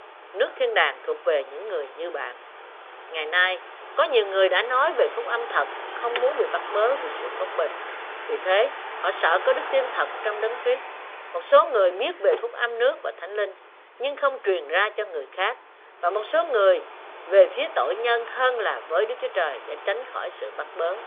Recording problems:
phone-call audio; nothing above 3.5 kHz
traffic noise; noticeable; throughout; 10 dB below the speech
alarm; noticeable; from 6 to 12 s; peak 9 dB below the speech

